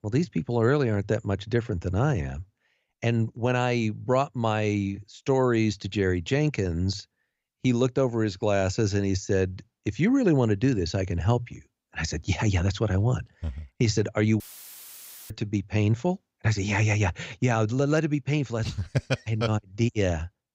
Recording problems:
audio cutting out; filled with static; at 14 s for 1 s

